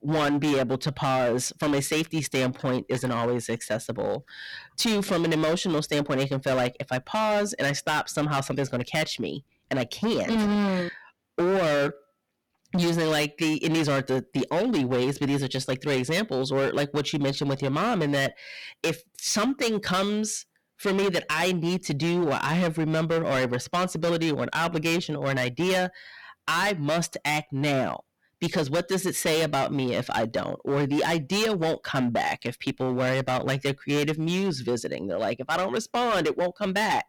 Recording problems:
distortion; heavy; 18% of the sound clipped

